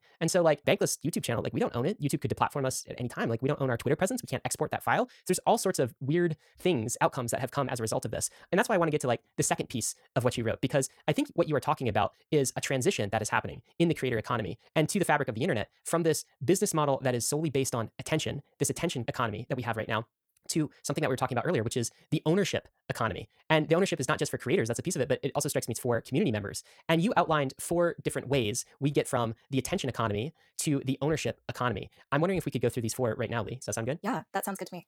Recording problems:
wrong speed, natural pitch; too fast; 1.7 times normal speed

